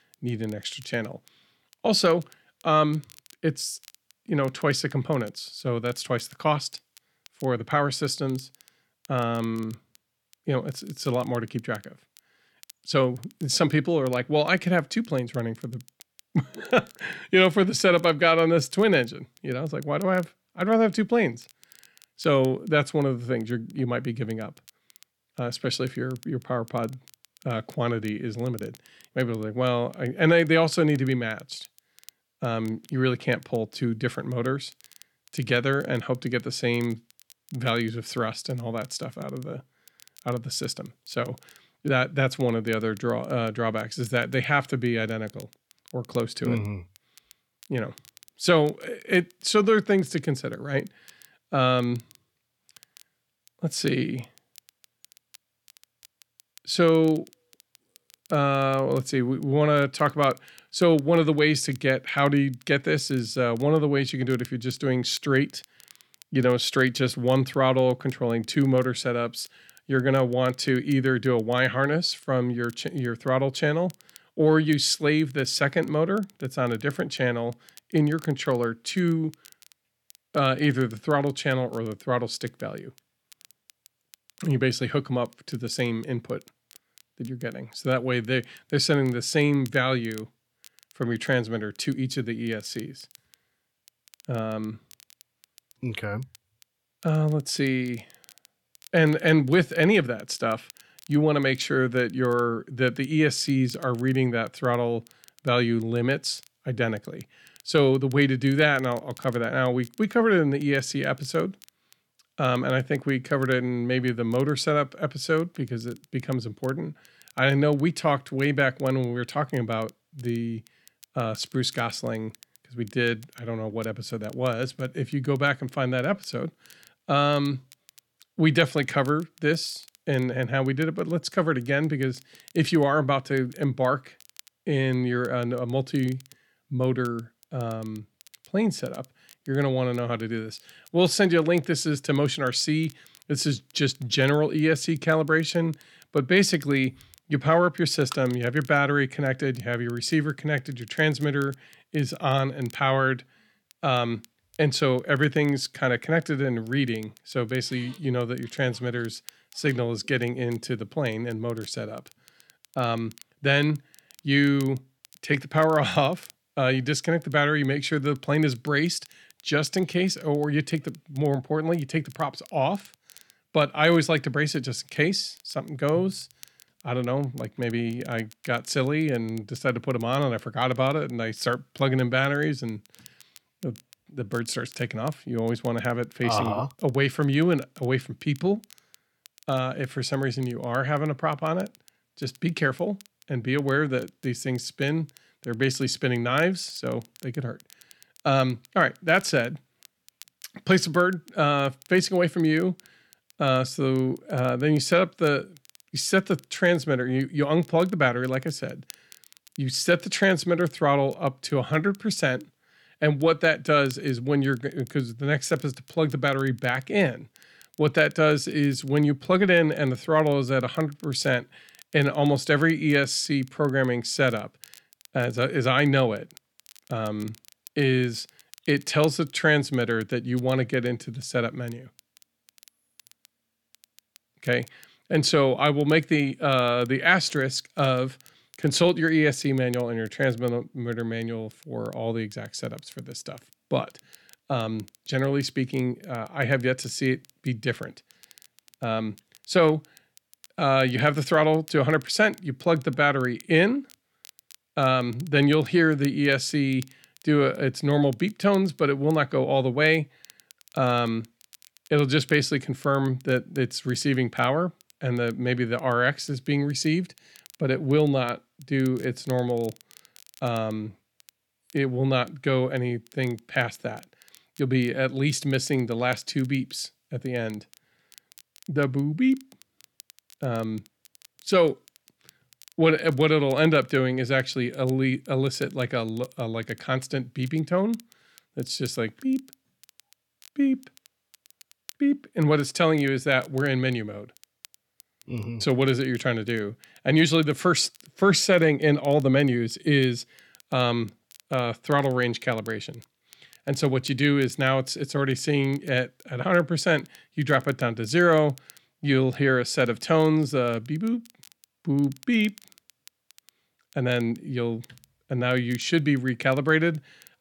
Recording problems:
crackle, like an old record; faint; 30 dB below the speech

